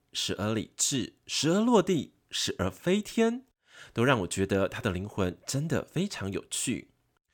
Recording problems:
none

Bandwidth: 17 kHz